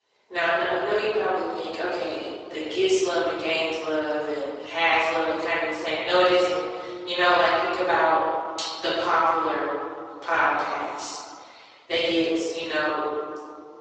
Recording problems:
room echo; strong; dies away in 2.2 s
off-mic speech; far
thin; very; fading below 400 Hz
garbled, watery; slightly; nothing above 8 kHz

